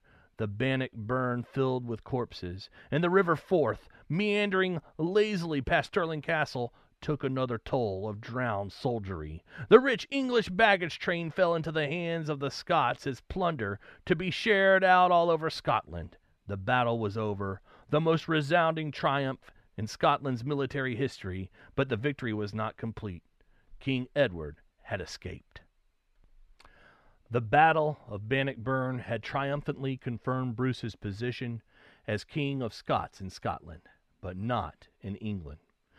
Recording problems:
muffled; slightly; fading above 4 kHz

